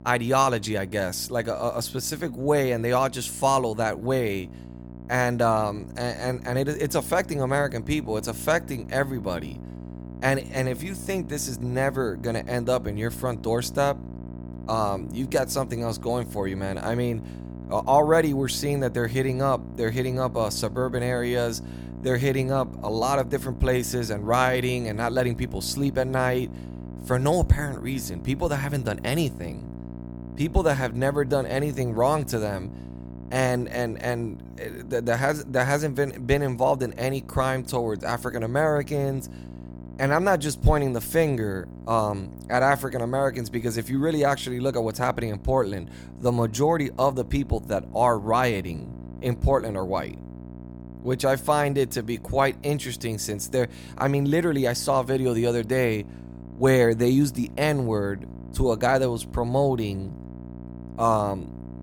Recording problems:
electrical hum; faint; throughout; 60 Hz, 20 dB below the speech

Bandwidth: 18 kHz